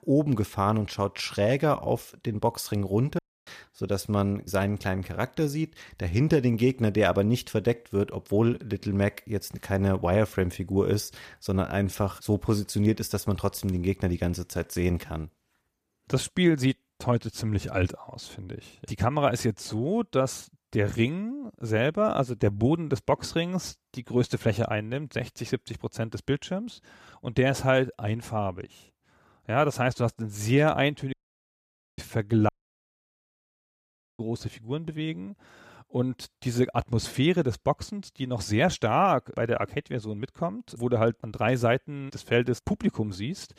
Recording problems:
audio cutting out; at 3 s, at 31 s for 1 s and at 32 s for 1.5 s

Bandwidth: 14.5 kHz